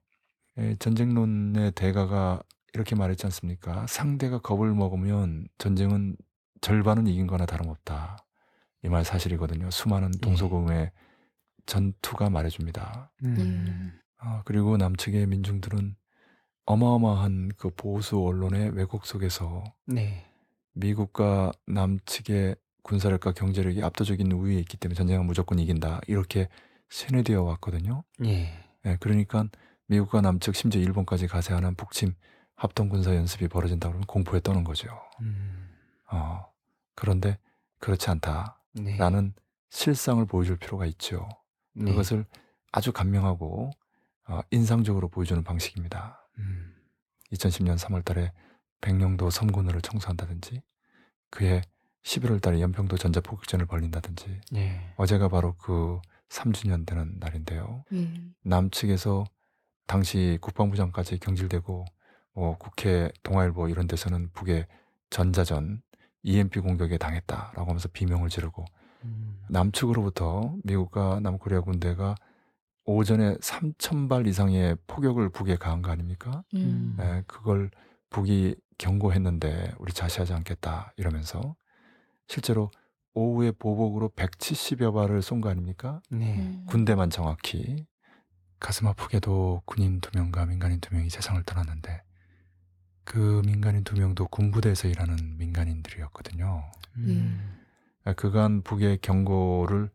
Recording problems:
none

